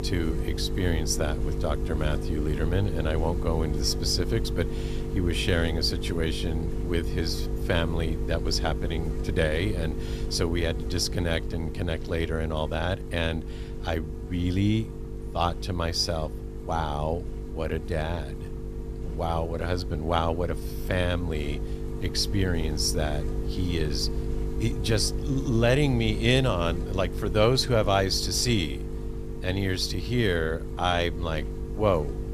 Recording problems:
electrical hum; noticeable; throughout; 50 Hz, 10 dB below the speech

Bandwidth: 14.5 kHz